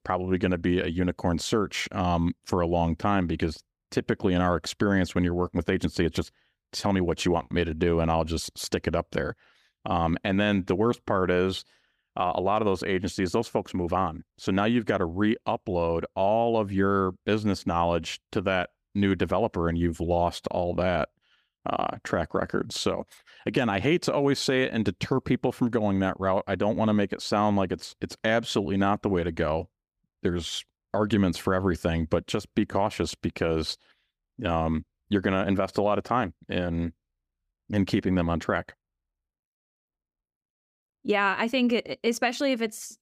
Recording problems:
none

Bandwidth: 15 kHz